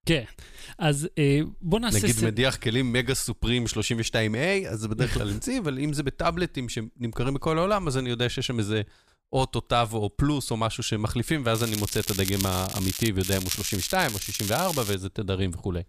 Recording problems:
crackling; loud; from 12 to 13 s and from 13 to 15 s; 5 dB below the speech

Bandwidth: 14.5 kHz